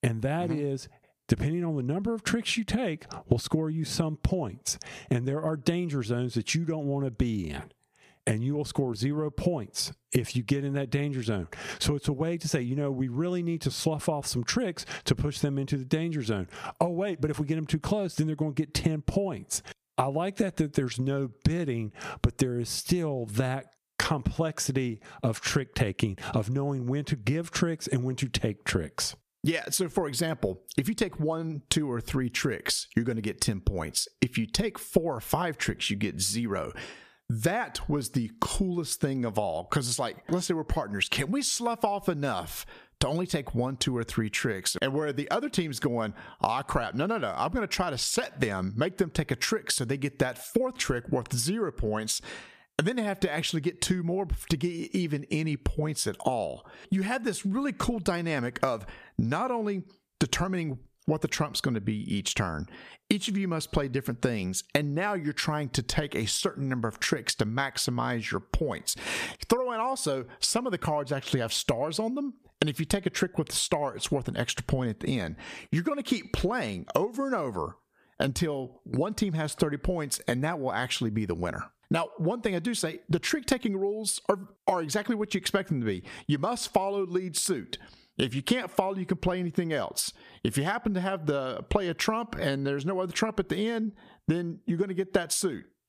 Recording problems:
squashed, flat; somewhat

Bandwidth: 14.5 kHz